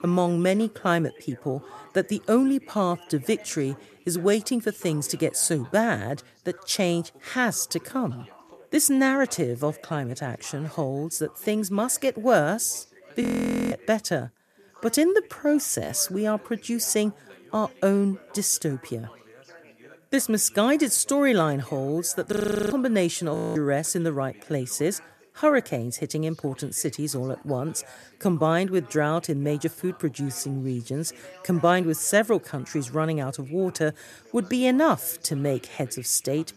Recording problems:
background chatter; faint; throughout; 3 voices, 25 dB below the speech
audio freezing; at 13 s, at 22 s and at 23 s

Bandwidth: 14 kHz